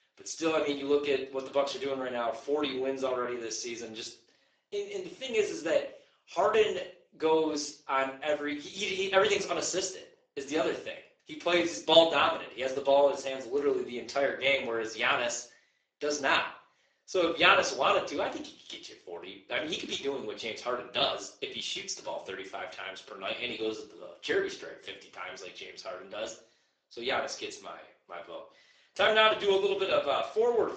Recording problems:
garbled, watery; badly; nothing above 7.5 kHz
thin; somewhat; fading below 350 Hz
room echo; slight; dies away in 0.4 s
off-mic speech; somewhat distant

